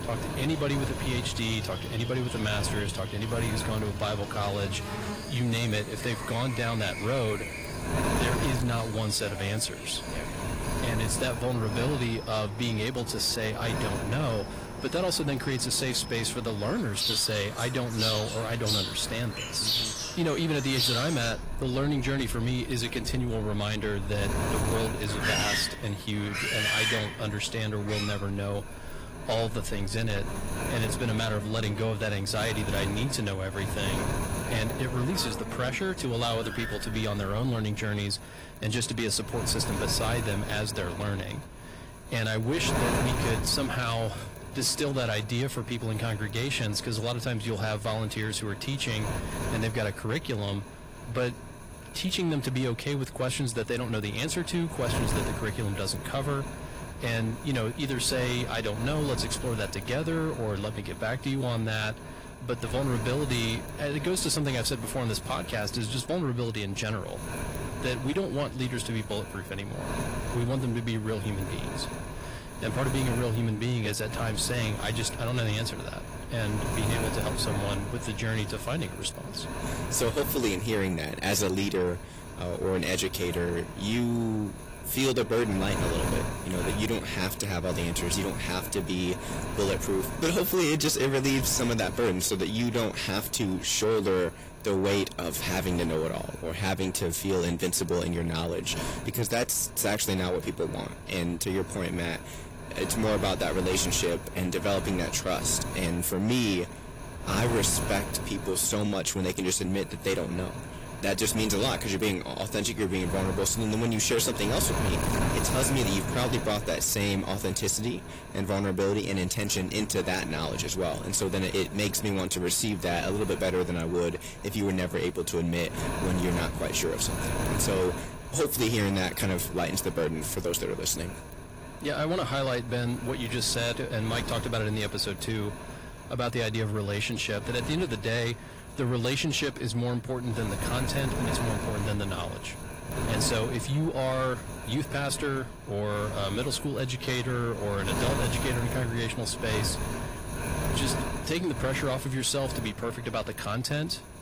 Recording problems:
distortion; slight; 10 dB below the speech
garbled, watery; slightly; nothing above 15 kHz
wind noise on the microphone; heavy; 8 dB below the speech
animal sounds; loud; until 38 s; 6 dB below the speech

